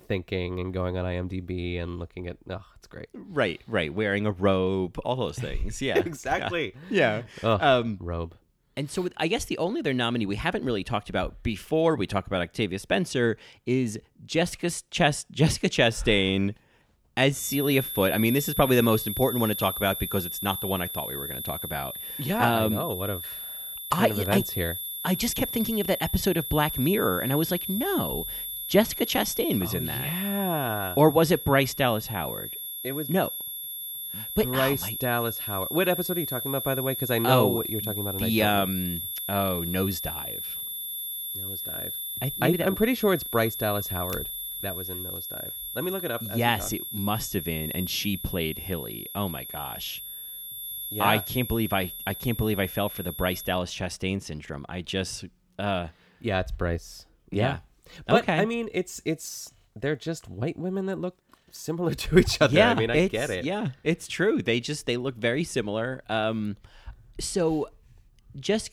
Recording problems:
high-pitched whine; loud; from 17 to 54 s; 11.5 kHz, 5 dB below the speech

